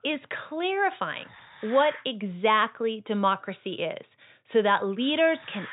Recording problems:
high frequencies cut off; severe; nothing above 4 kHz
hiss; noticeable; until 2 s and from 3 s on; 20 dB below the speech

